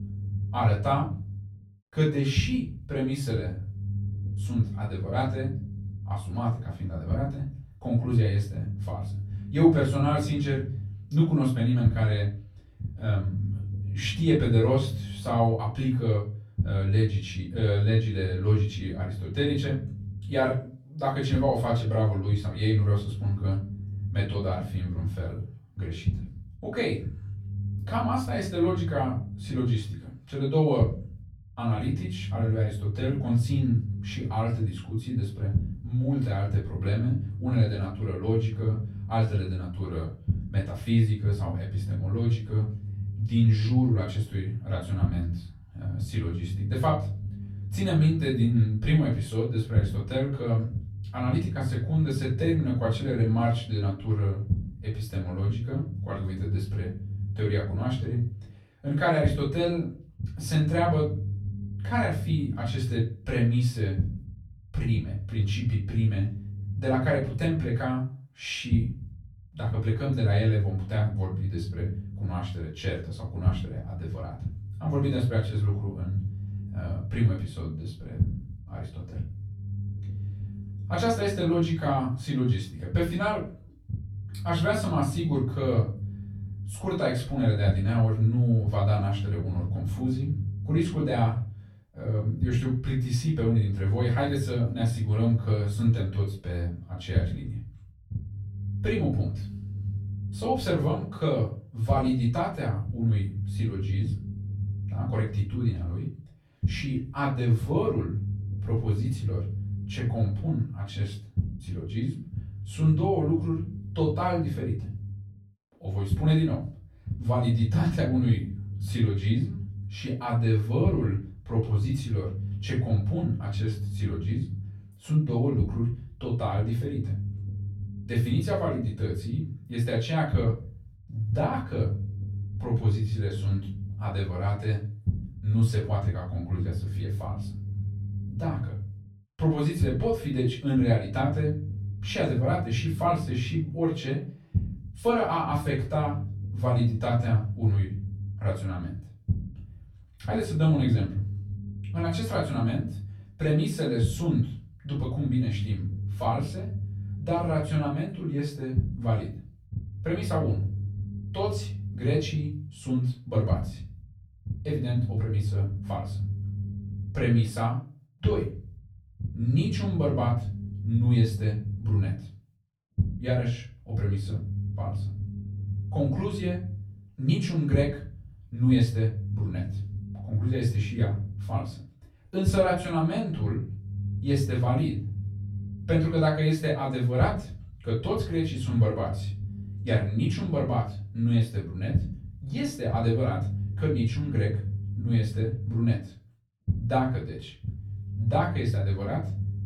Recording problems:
off-mic speech; far
room echo; slight; dies away in 0.4 s
low rumble; noticeable; throughout; 15 dB below the speech

